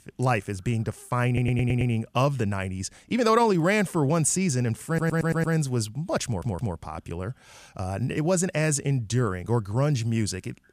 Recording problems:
audio stuttering; at 1.5 s, at 5 s and at 6.5 s

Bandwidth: 14.5 kHz